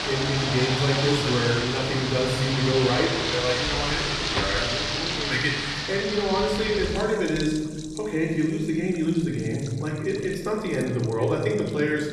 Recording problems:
off-mic speech; far
room echo; noticeable; dies away in 1.3 s
rain or running water; loud; throughout; 1 dB below the speech

